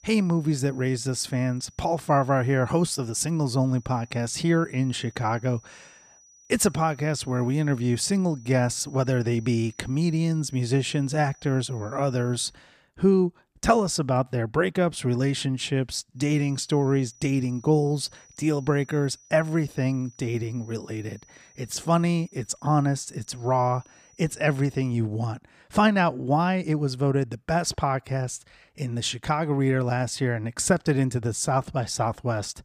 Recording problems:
high-pitched whine; faint; until 13 s and from 16 to 25 s; 6 kHz, 30 dB below the speech

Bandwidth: 15 kHz